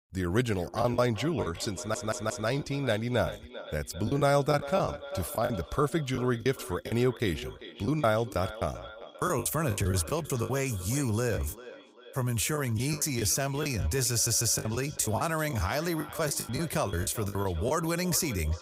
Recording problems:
echo of what is said; noticeable; throughout; 390 ms later, 15 dB below the speech
choppy; very; 11% of the speech affected
audio stuttering; at 2 s and at 14 s

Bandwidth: 15.5 kHz